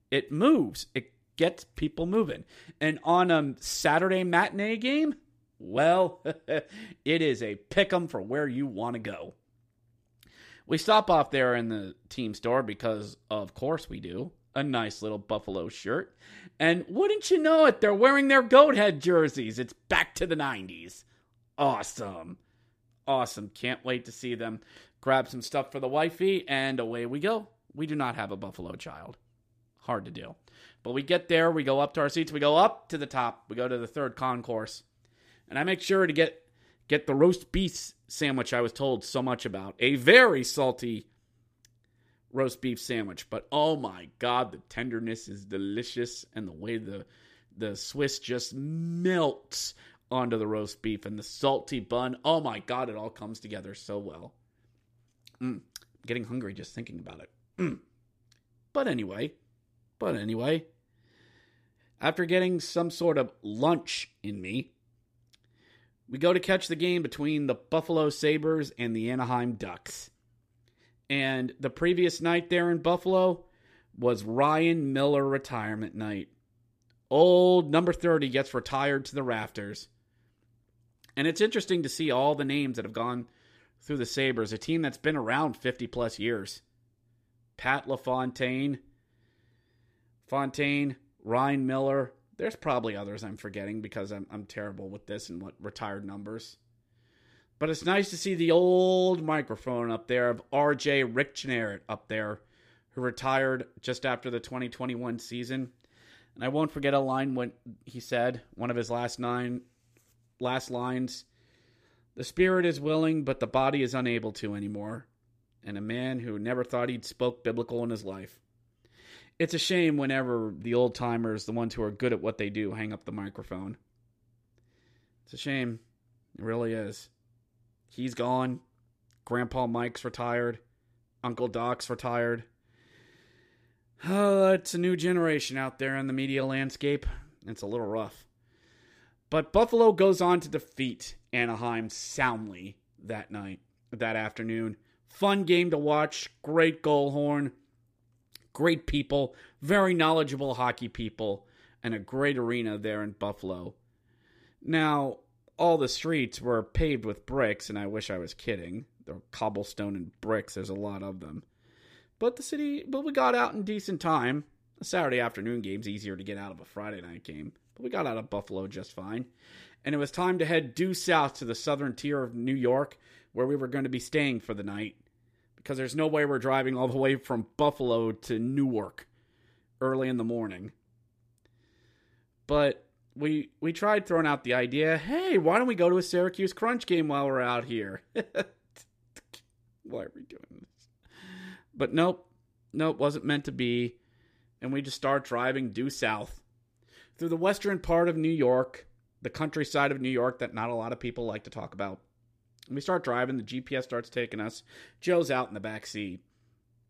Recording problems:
none

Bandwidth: 15 kHz